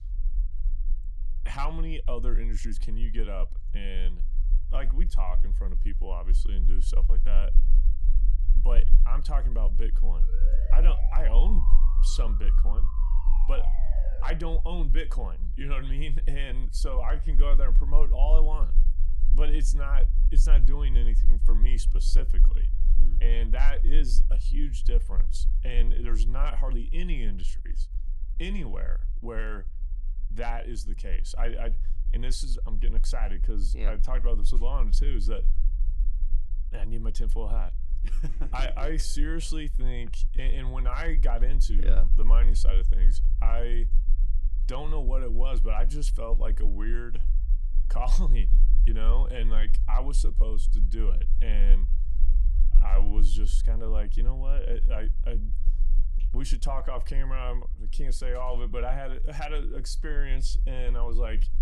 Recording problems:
low rumble; noticeable; throughout; 15 dB below the speech
siren; noticeable; from 10 to 14 s; peak 9 dB below the speech

